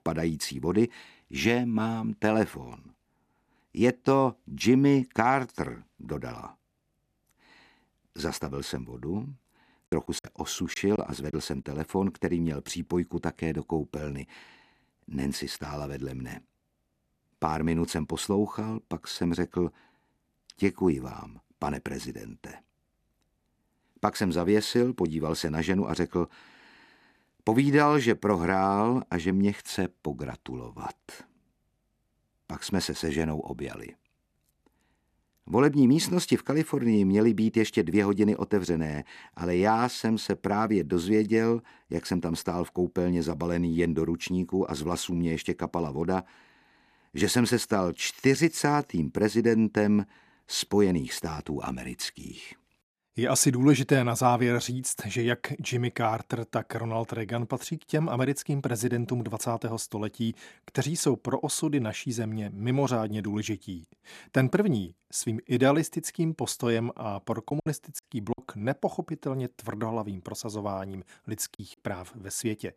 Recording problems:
choppy; very; from 10 to 11 s, at 1:08 and at 1:12; 7% of the speech affected

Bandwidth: 14.5 kHz